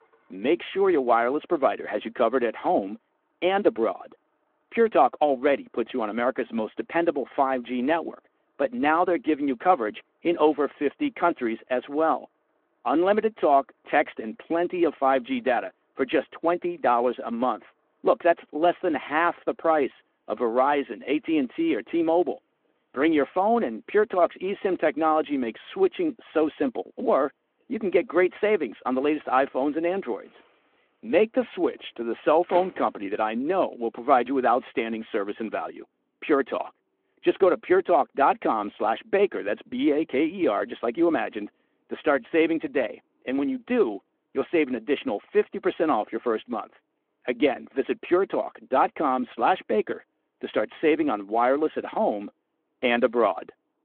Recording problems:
phone-call audio
traffic noise; faint; throughout; 25 dB below the speech

